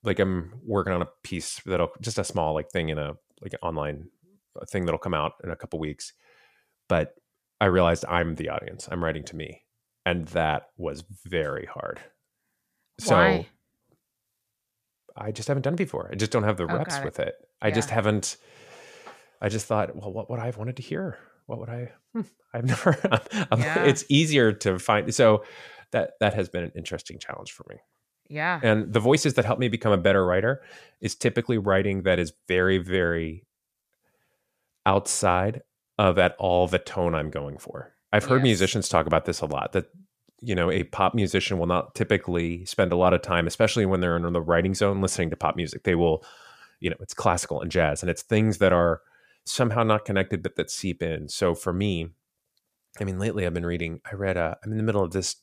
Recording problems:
none

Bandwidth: 14.5 kHz